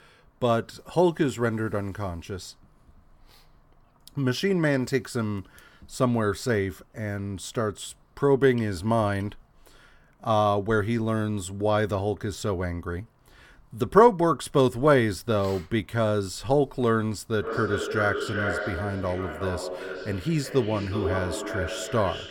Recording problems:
echo of what is said; strong; from 17 s on; 370 ms later, 7 dB below the speech

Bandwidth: 17 kHz